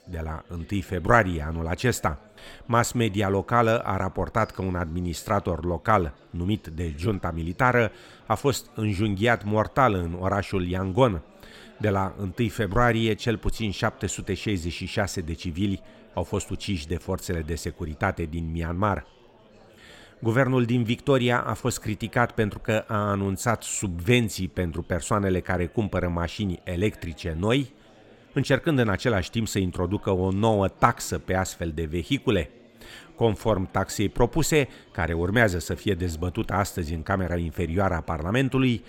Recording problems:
chatter from many people; faint; throughout; 25 dB below the speech

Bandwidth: 16.5 kHz